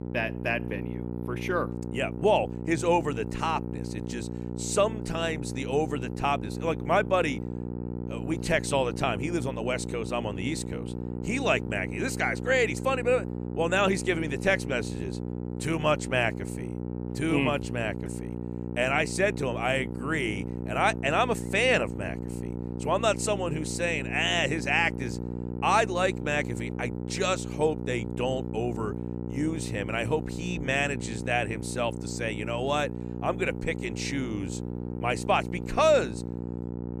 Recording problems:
electrical hum; noticeable; throughout; 60 Hz, 15 dB below the speech

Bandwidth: 14.5 kHz